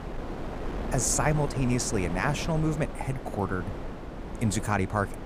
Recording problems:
wind noise on the microphone; heavy; 9 dB below the speech

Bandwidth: 15 kHz